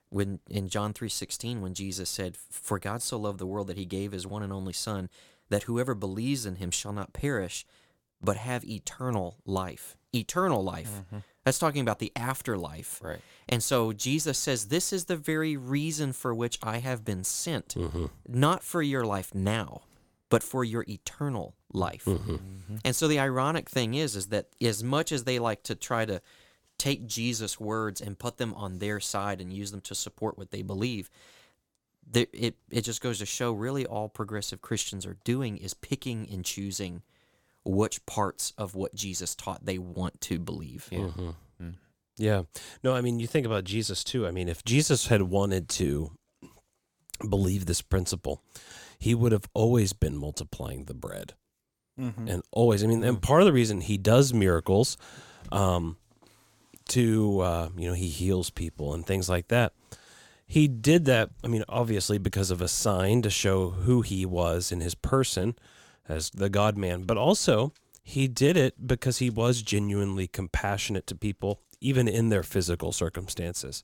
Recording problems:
none

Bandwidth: 17 kHz